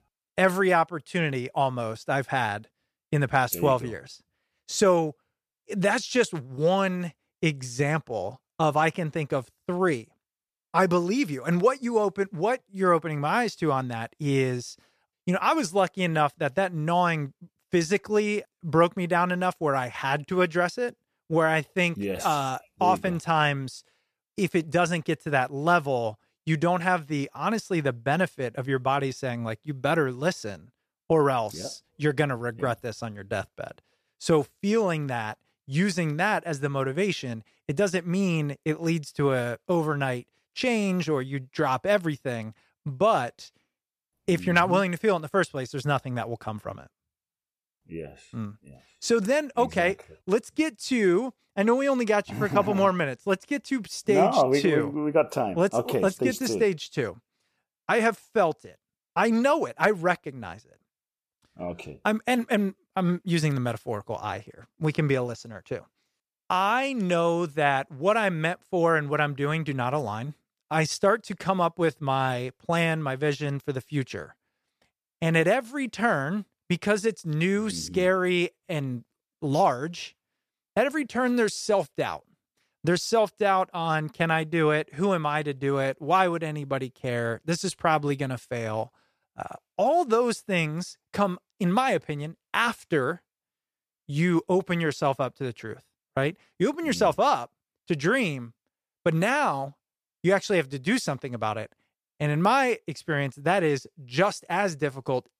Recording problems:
none

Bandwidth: 14.5 kHz